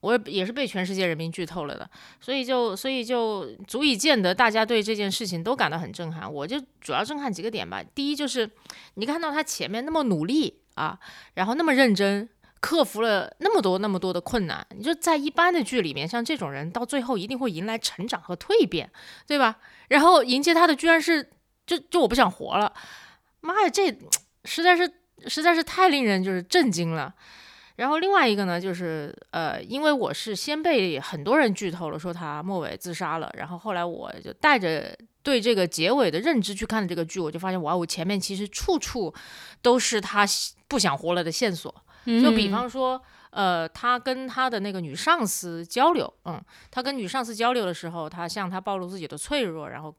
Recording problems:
none

